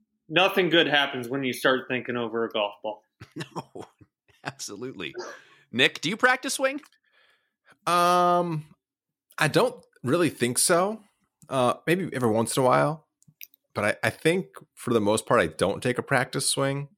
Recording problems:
none

